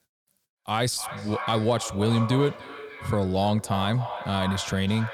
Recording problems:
echo of what is said; strong; throughout; 300 ms later, 10 dB below the speech

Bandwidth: 18.5 kHz